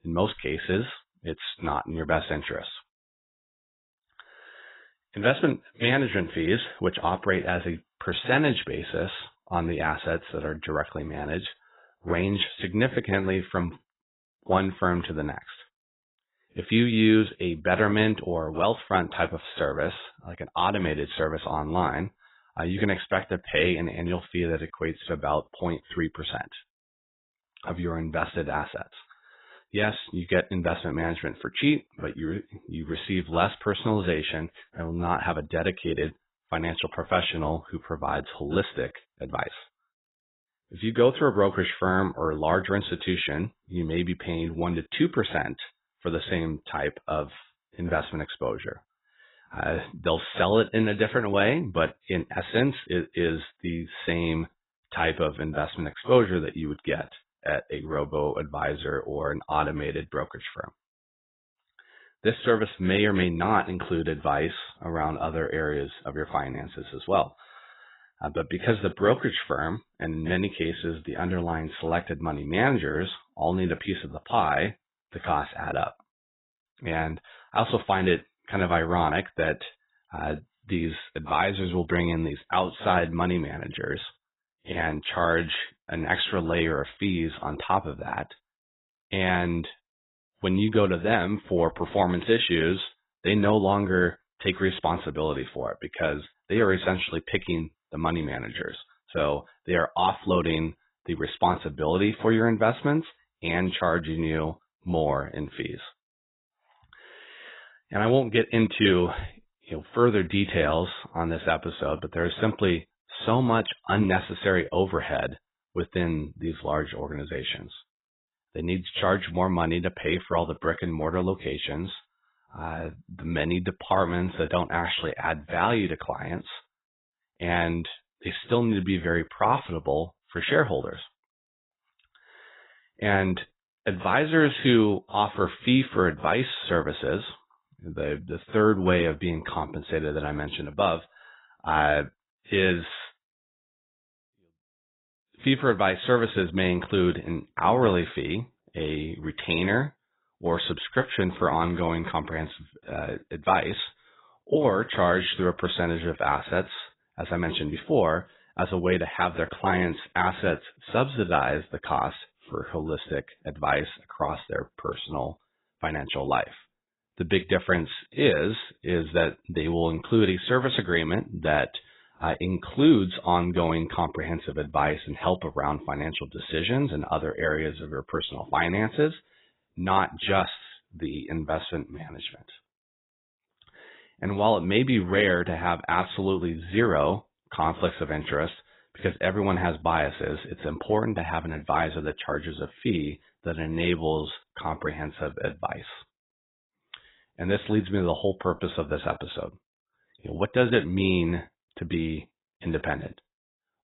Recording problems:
garbled, watery; badly; nothing above 4 kHz

